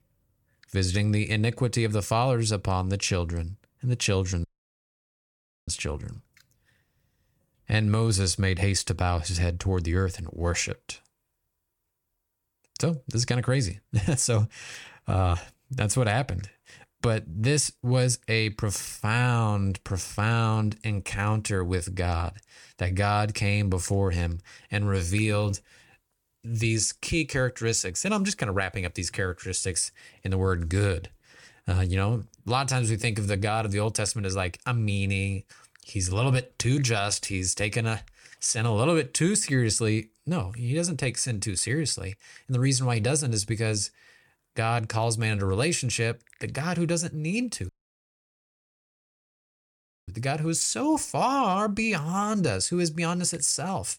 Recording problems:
audio cutting out; at 4.5 s for 1 s and at 48 s for 2.5 s

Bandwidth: 18 kHz